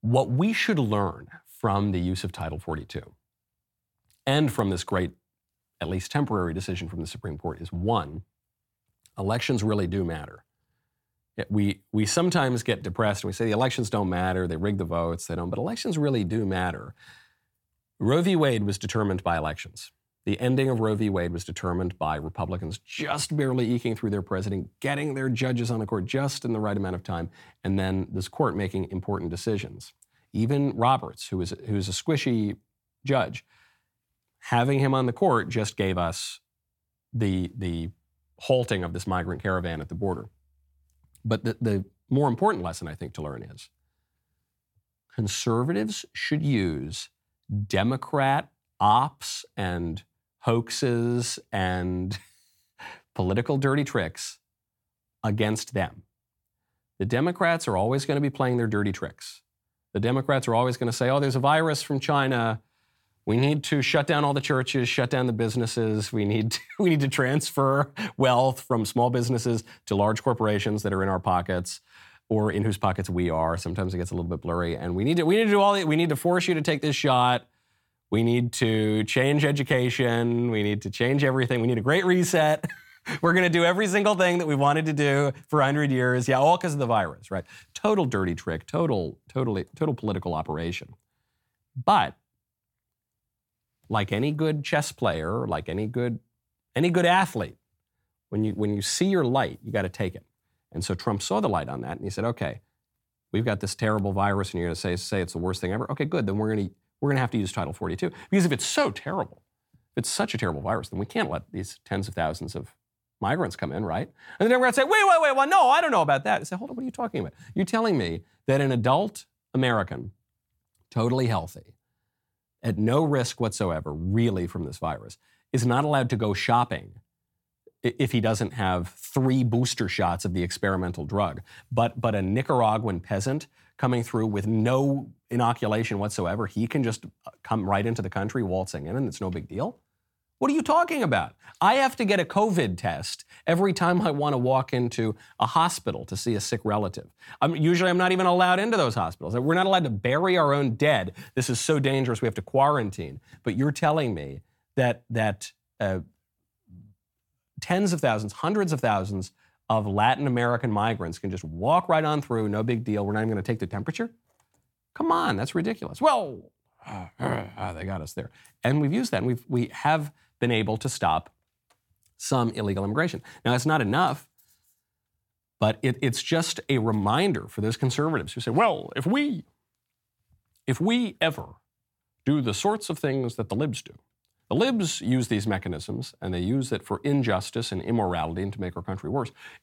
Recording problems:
none

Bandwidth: 17 kHz